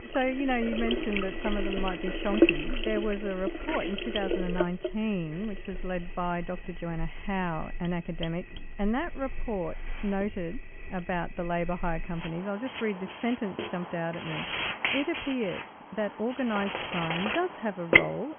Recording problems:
high frequencies cut off; severe; nothing above 3.5 kHz
household noises; very loud; throughout; 1 dB above the speech

